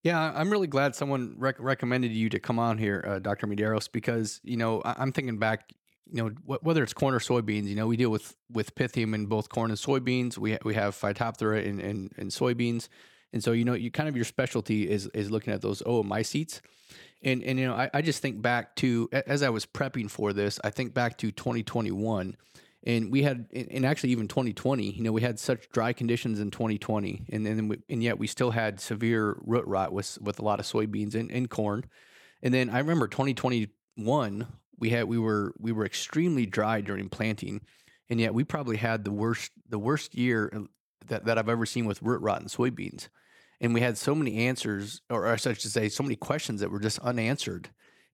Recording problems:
none

